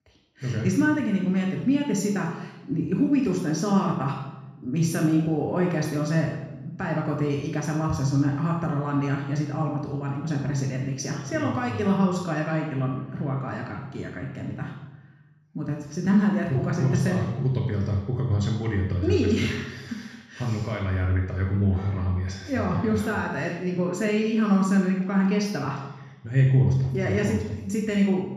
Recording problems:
off-mic speech; far
room echo; noticeable; dies away in 1 s

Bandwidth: 14.5 kHz